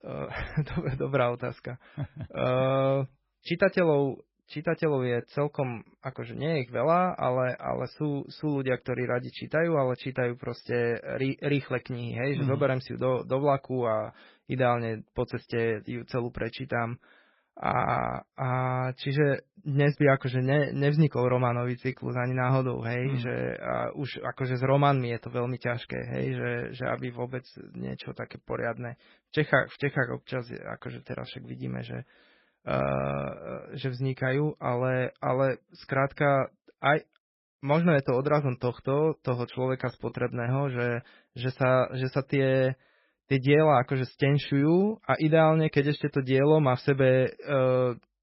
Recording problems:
garbled, watery; badly; nothing above 5.5 kHz

